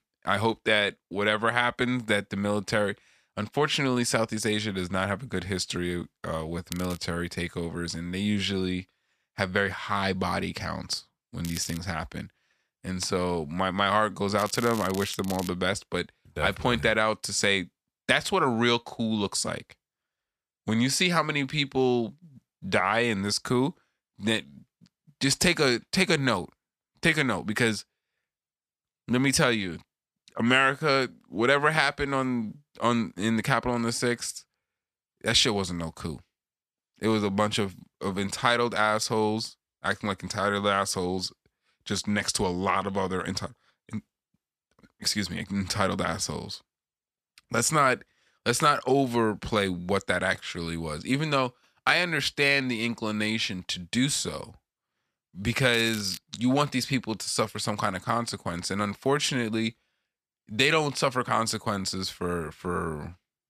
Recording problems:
crackling; noticeable; 4 times, first at 6.5 s; 15 dB below the speech

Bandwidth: 14.5 kHz